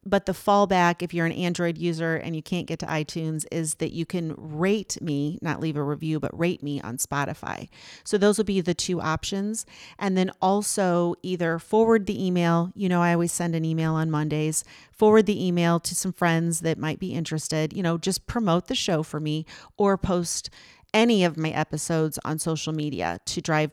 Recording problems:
none

